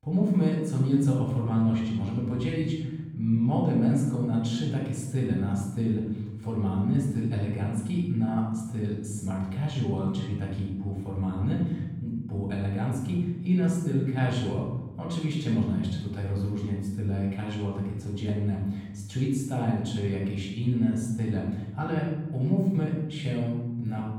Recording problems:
off-mic speech; far
room echo; noticeable; dies away in 1.2 s

